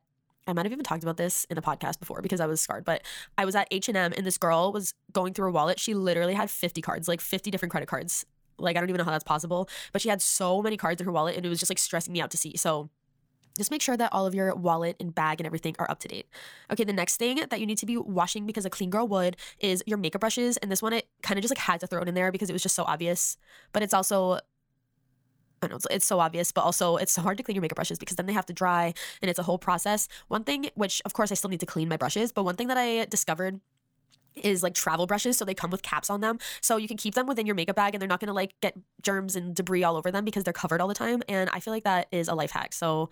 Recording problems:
wrong speed, natural pitch; too fast; 1.5 times normal speed

